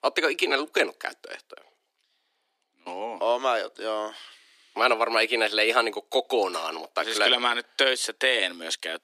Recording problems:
thin; very; fading below 300 Hz

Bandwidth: 15 kHz